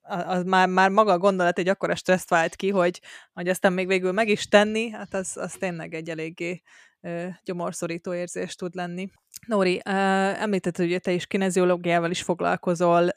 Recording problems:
none

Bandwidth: 14.5 kHz